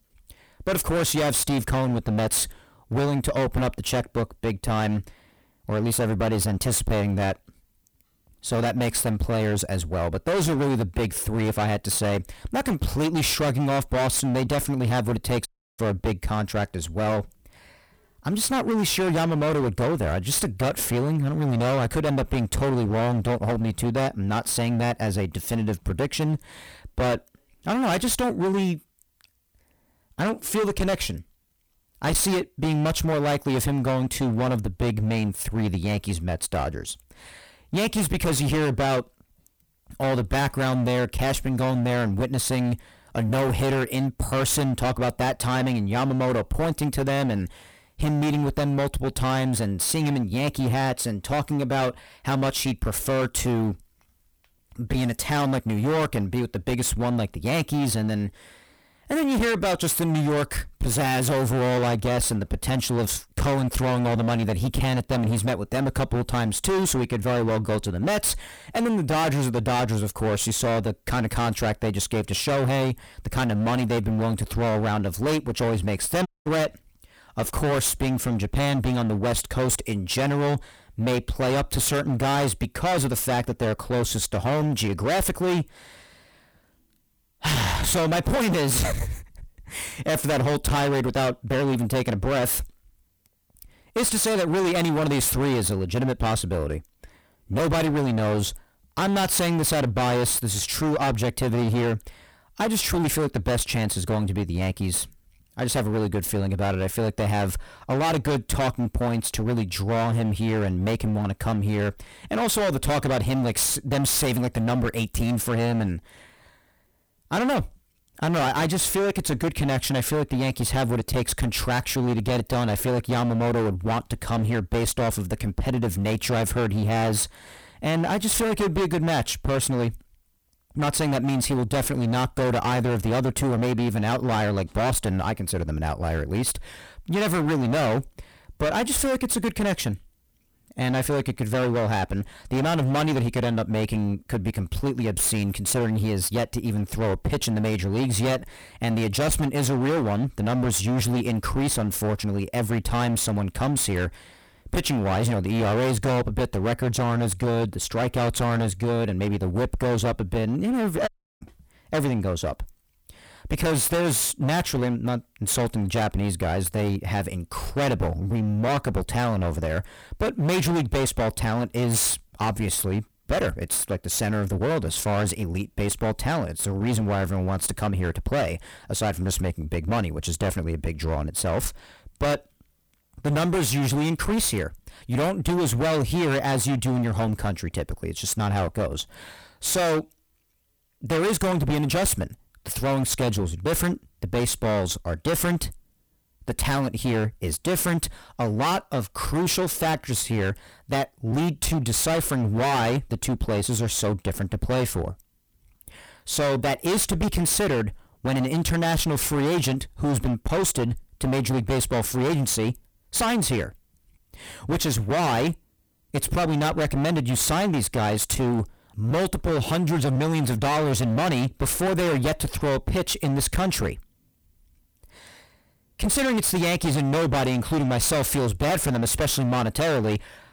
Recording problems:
distortion; heavy; 28% of the sound clipped
audio cutting out; at 15 s, at 1:16 and at 2:41

